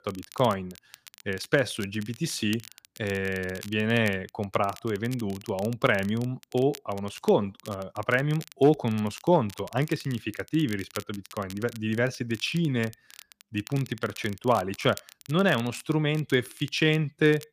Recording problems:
crackle, like an old record; noticeable; 20 dB below the speech

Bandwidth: 15 kHz